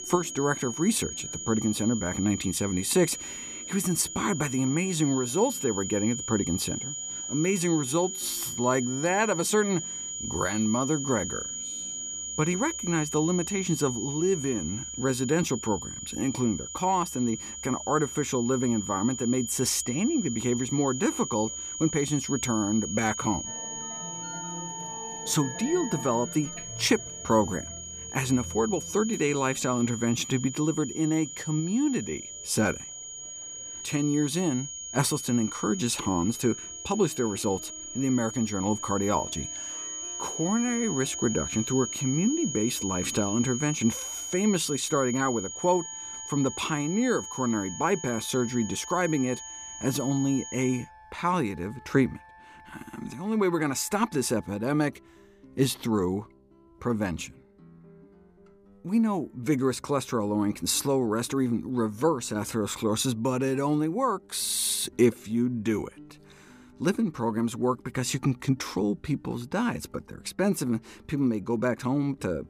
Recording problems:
high-pitched whine; loud; until 51 s; 6.5 kHz, 7 dB below the speech
background music; faint; throughout; 25 dB below the speech

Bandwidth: 15 kHz